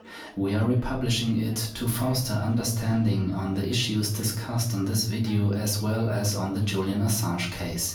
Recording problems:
off-mic speech; far
room echo; slight; dies away in 0.5 s
chatter from many people; faint; throughout; 25 dB below the speech

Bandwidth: 18.5 kHz